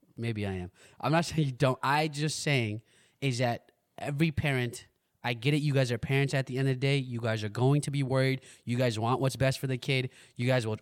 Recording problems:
none

